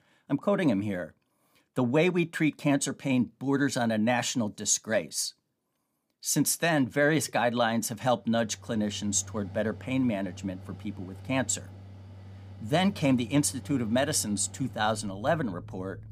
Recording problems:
machinery noise; noticeable; from 8.5 s on; 15 dB below the speech

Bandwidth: 15 kHz